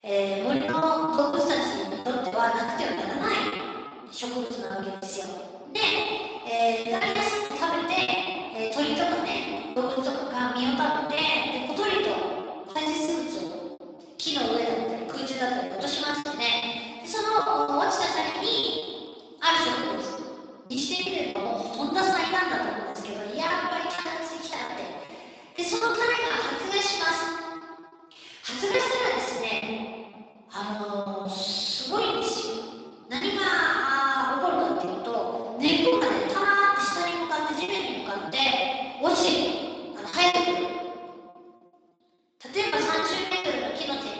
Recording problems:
room echo; strong; dies away in 1.8 s
off-mic speech; far
echo of what is said; noticeable; from 30 s on; 90 ms later, 15 dB below the speech
garbled, watery; slightly; nothing above 8 kHz
thin; very slightly; fading below 350 Hz
choppy; very; 15% of the speech affected

